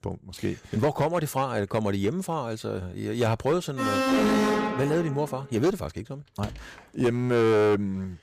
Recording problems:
distortion; slight; 9% of the sound clipped
alarm; loud; from 4 to 5 s; peak 5 dB above the speech
door banging; faint; at 6.5 s; peak 15 dB below the speech

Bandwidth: 15 kHz